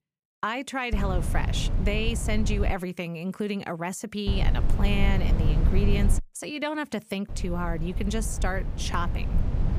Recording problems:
low rumble; loud; from 1 to 2.5 s, from 4.5 to 6 s and from 7.5 s on; 9 dB below the speech

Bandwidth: 15 kHz